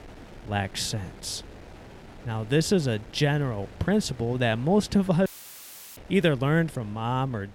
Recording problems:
wind noise on the microphone; occasional gusts; 20 dB below the speech
audio cutting out; filled with static; at 5.5 s for 0.5 s

